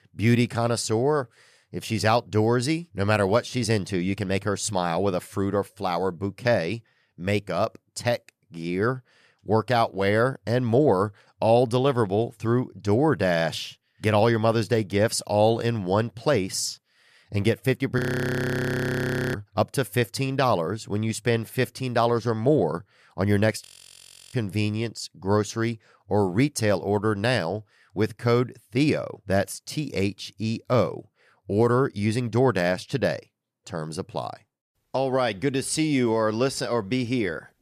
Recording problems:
audio freezing; at 18 s for 1.5 s and at 24 s for 0.5 s

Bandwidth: 14.5 kHz